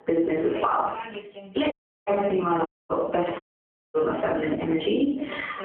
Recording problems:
phone-call audio; poor line; nothing above 3.5 kHz
off-mic speech; far
squashed, flat; heavily, background pumping
room echo; noticeable; dies away in 0.4 s
voice in the background; noticeable; throughout; 15 dB below the speech
audio cutting out; at 1.5 s, at 2.5 s and at 3.5 s for 0.5 s

